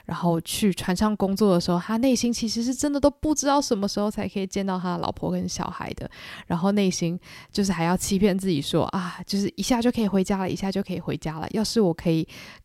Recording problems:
none

